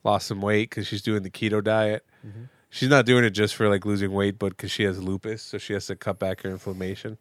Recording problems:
none

